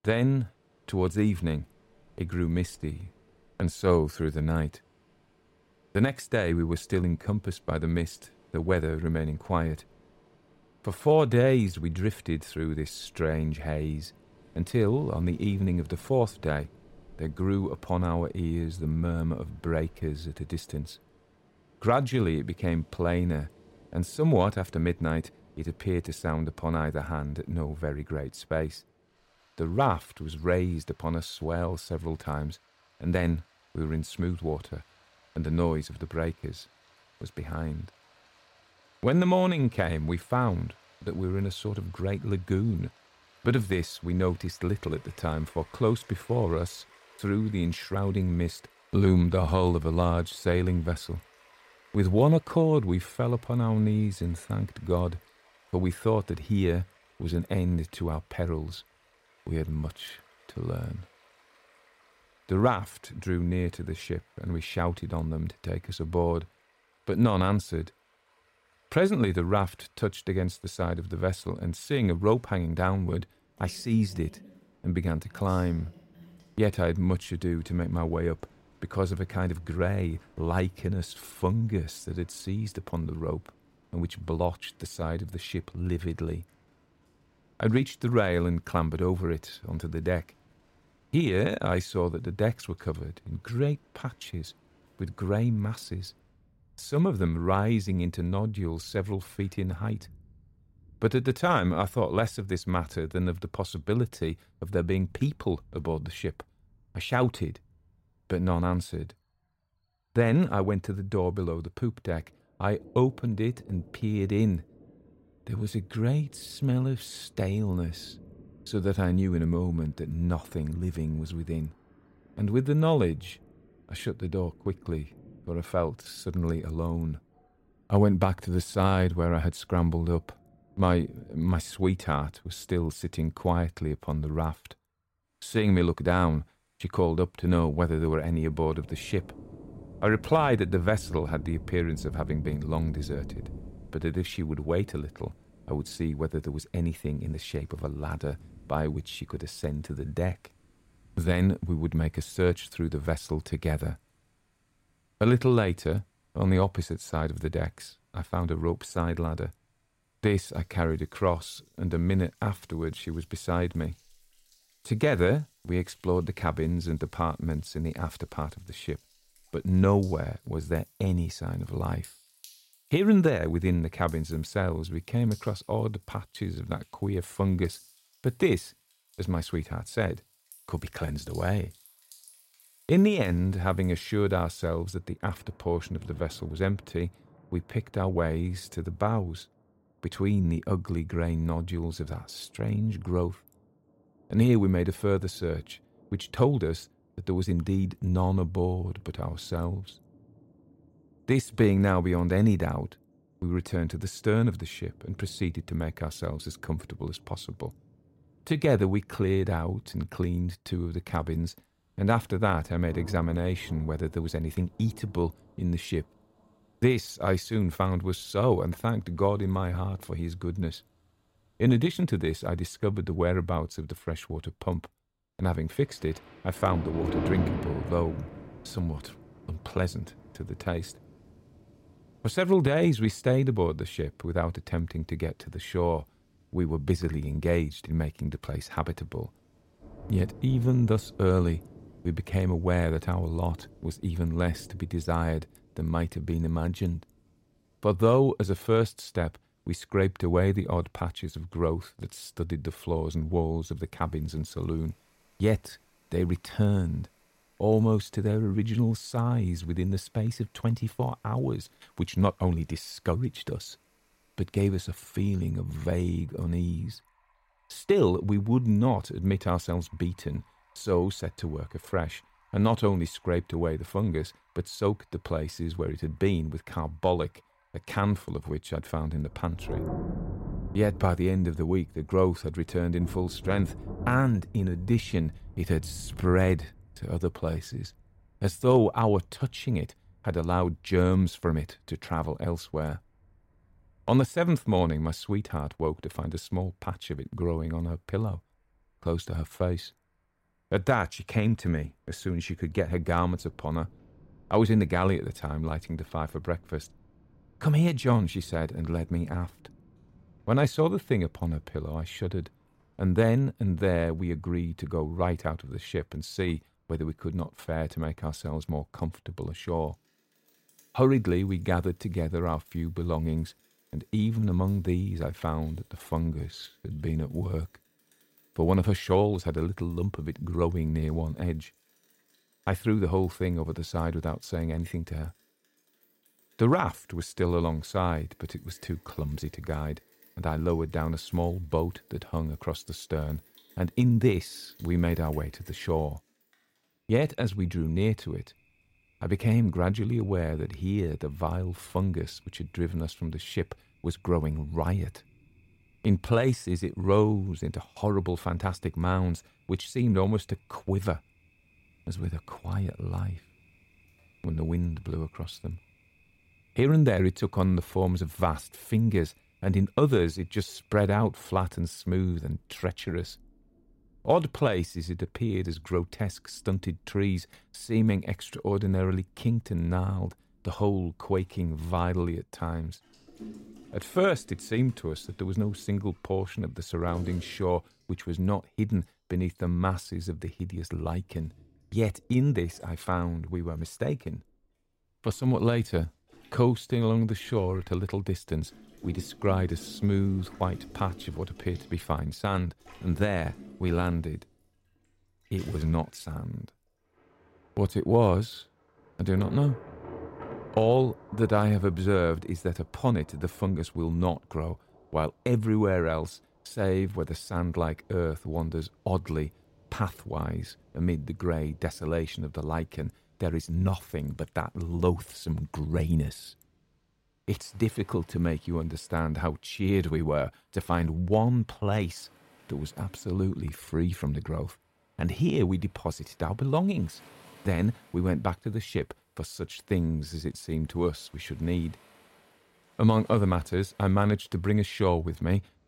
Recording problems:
rain or running water; noticeable; throughout; 20 dB below the speech

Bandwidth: 16 kHz